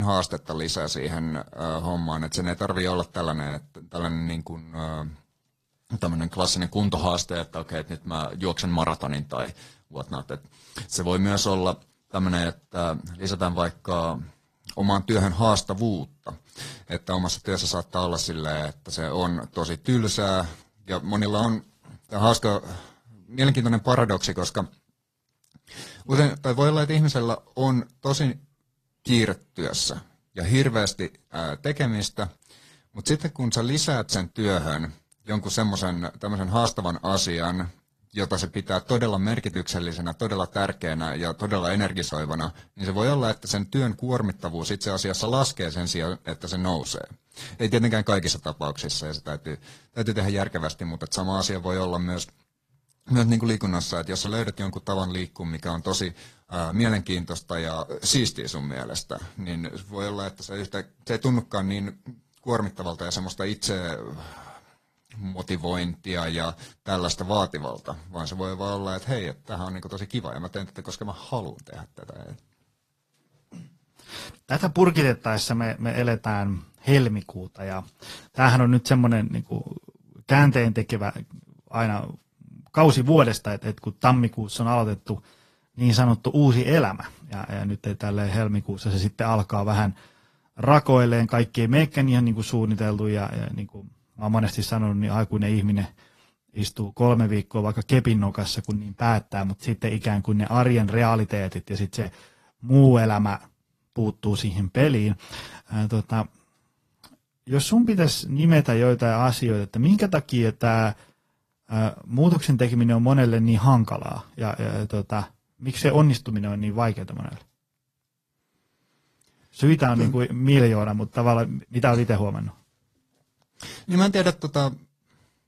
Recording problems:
garbled, watery; slightly; nothing above 14.5 kHz
abrupt cut into speech; at the start

